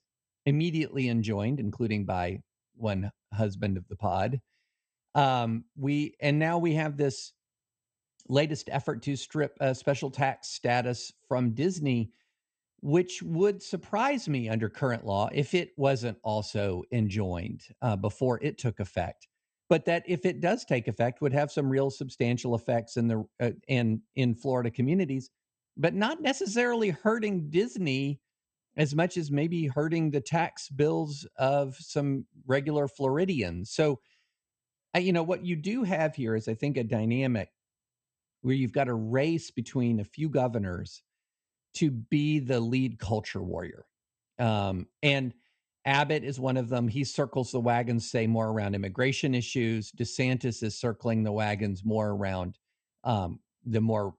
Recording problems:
garbled, watery; slightly; nothing above 8.5 kHz

